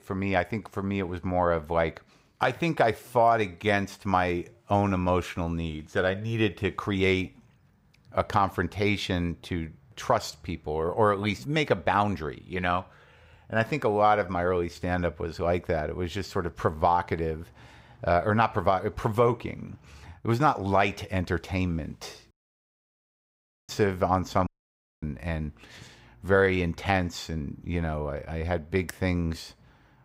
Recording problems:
audio cutting out; at 22 s for 1.5 s and at 24 s for 0.5 s

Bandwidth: 15.5 kHz